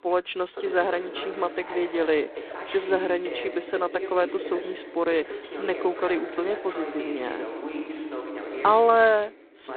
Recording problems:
phone-call audio; poor line; nothing above 4 kHz
voice in the background; loud; throughout; 9 dB below the speech

